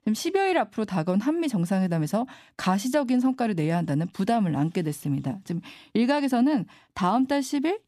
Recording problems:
none

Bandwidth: 14.5 kHz